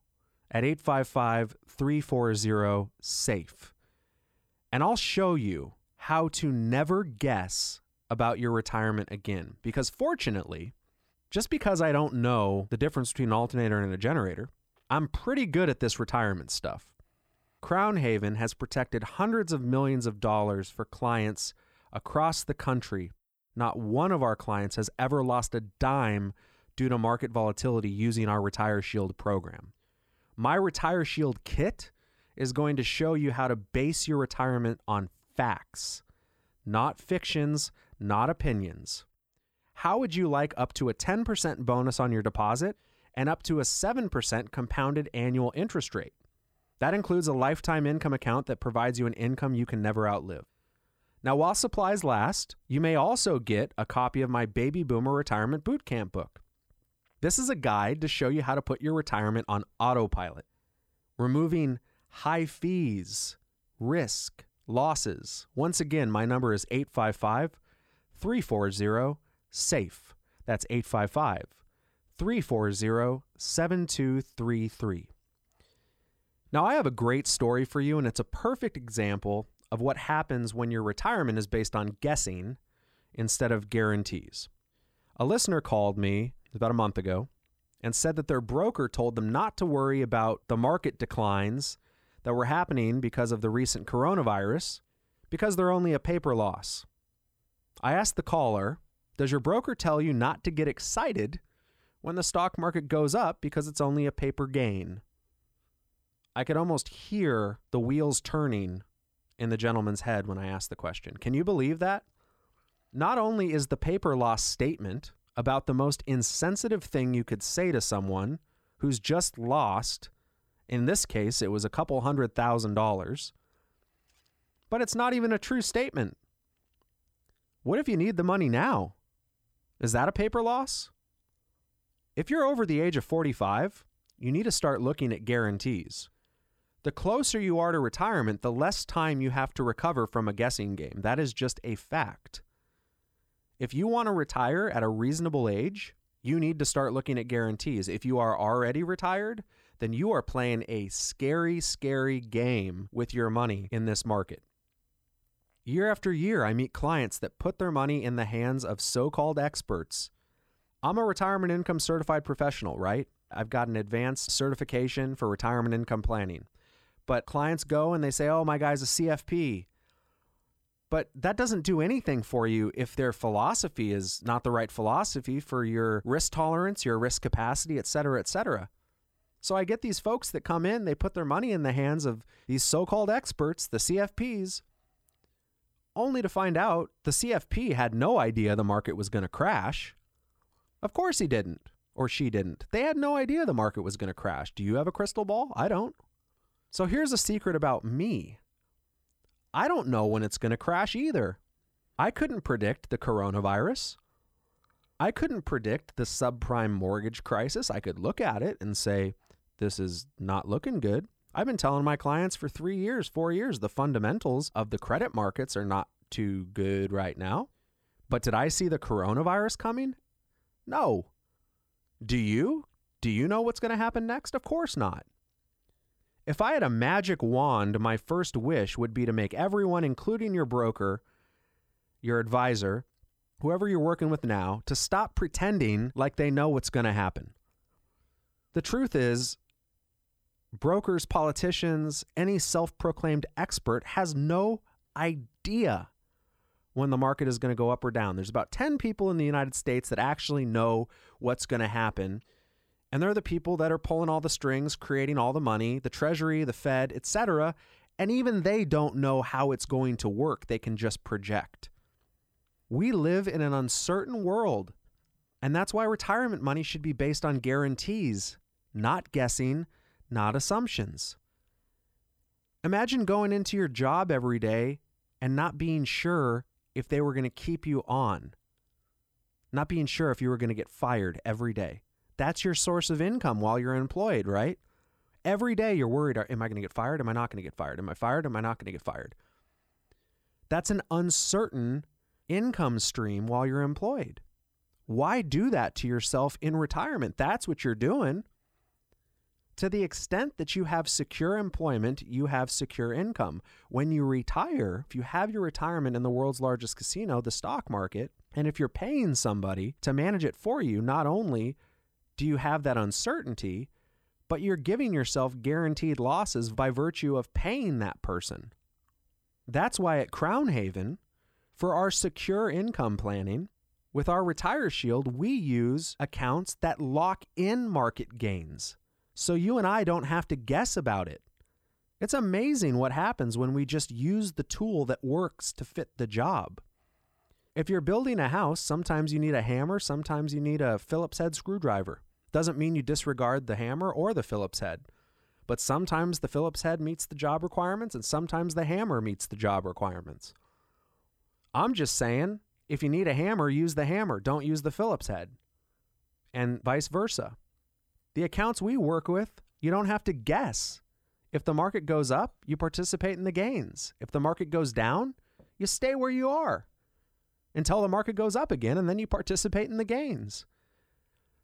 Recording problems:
none

